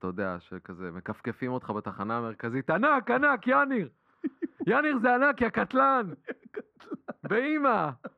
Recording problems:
muffled; very; fading above 3 kHz

